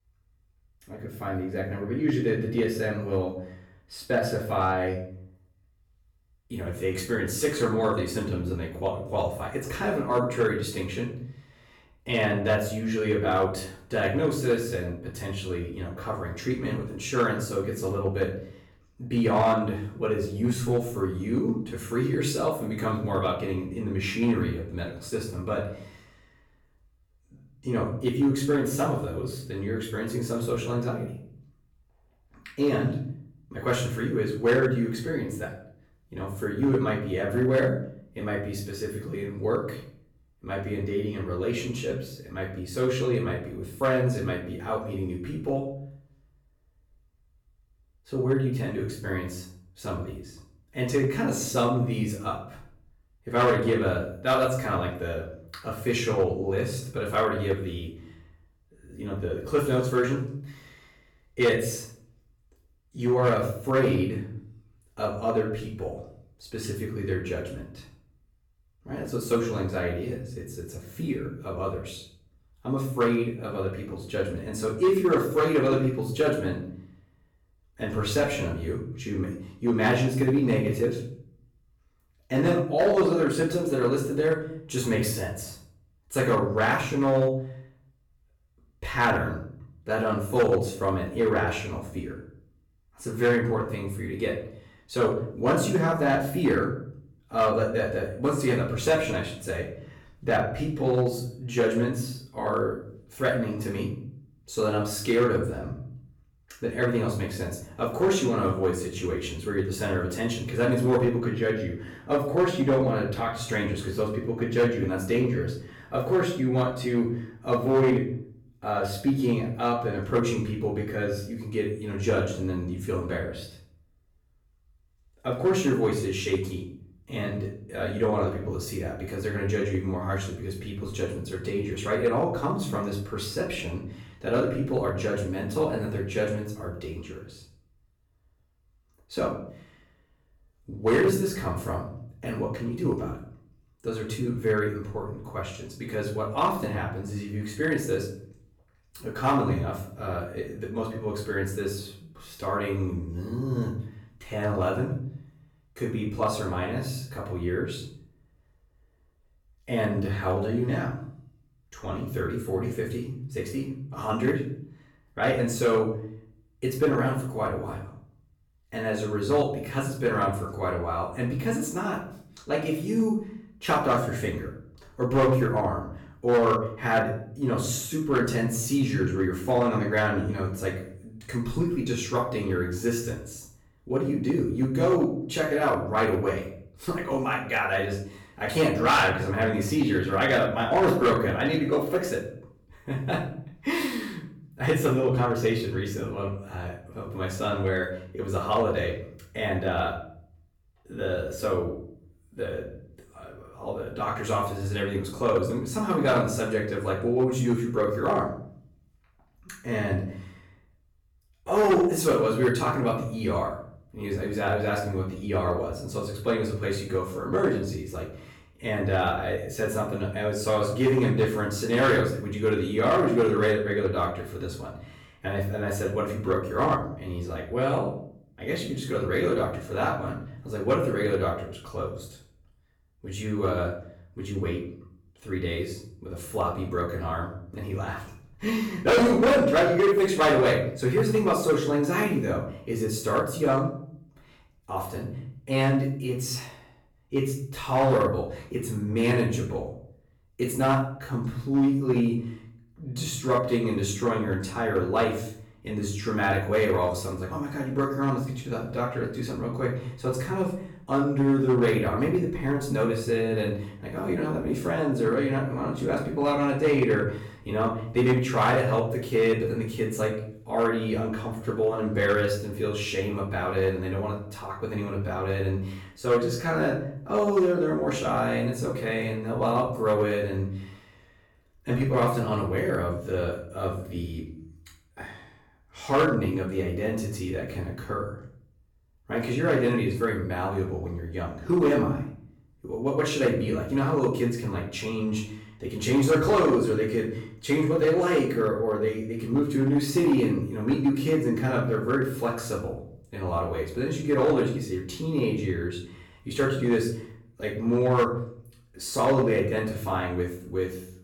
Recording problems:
off-mic speech; far
room echo; noticeable; dies away in 0.6 s
distortion; slight; 1.8% of the sound clipped

